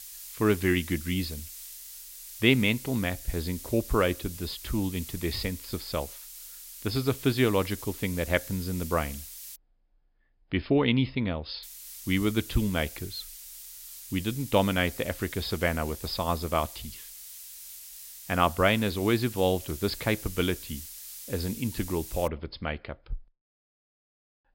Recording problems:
high frequencies cut off; noticeable; nothing above 5.5 kHz
hiss; noticeable; until 9.5 s and from 12 to 22 s; 10 dB below the speech

